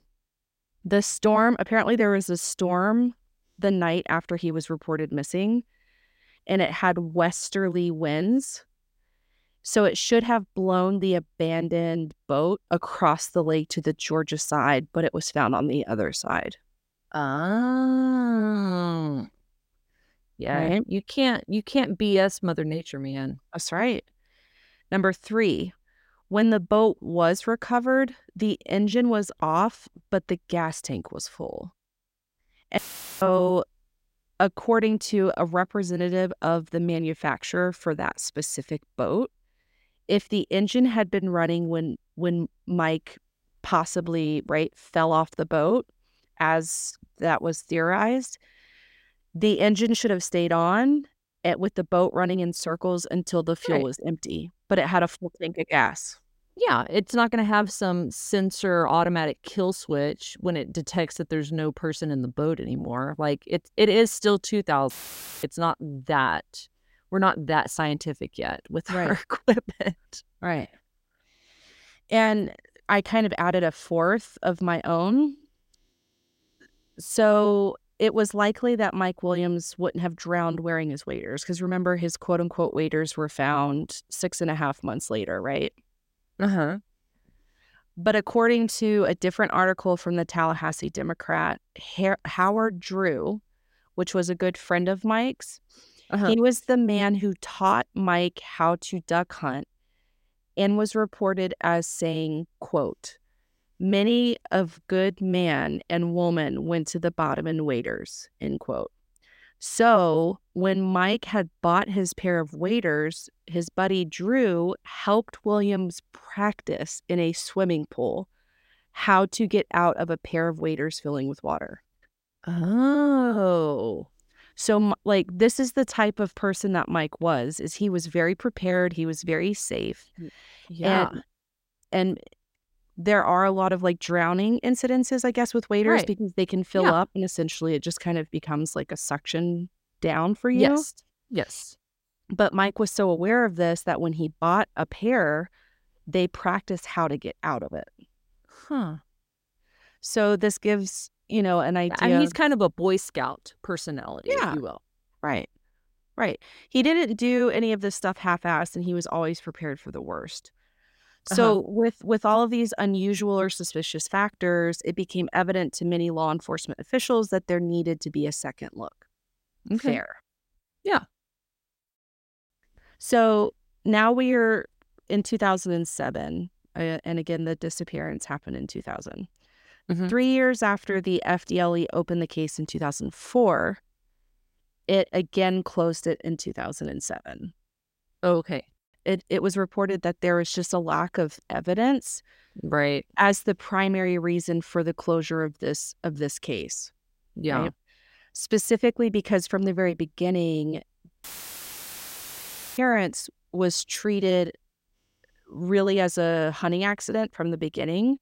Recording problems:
audio cutting out; filled with static; at 33 s, at 1:05 for 0.5 s and at 3:21 for 1.5 s

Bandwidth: 16 kHz